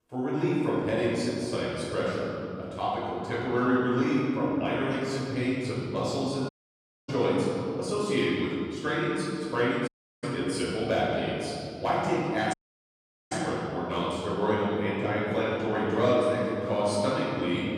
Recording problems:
room echo; strong; dies away in 2.9 s
off-mic speech; far
audio cutting out; at 6.5 s for 0.5 s, at 10 s and at 13 s for 1 s

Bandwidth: 15.5 kHz